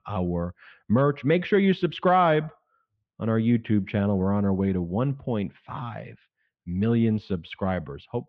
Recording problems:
muffled; very; fading above 3.5 kHz

